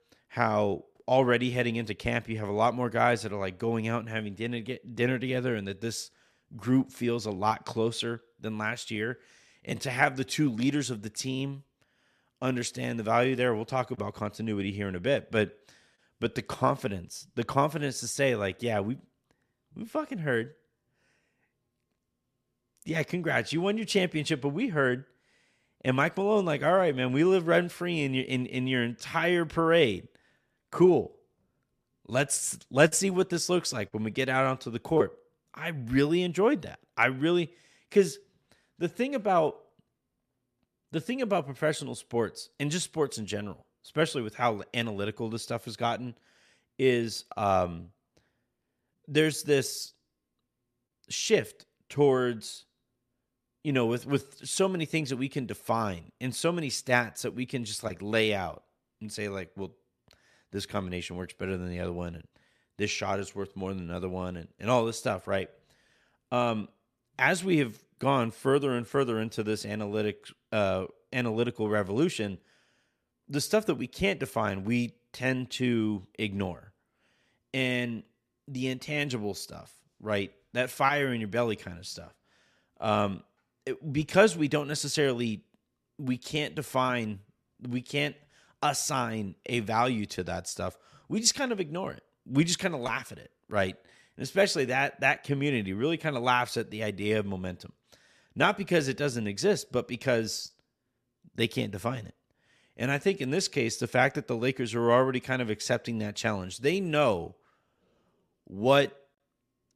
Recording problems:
none

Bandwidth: 14 kHz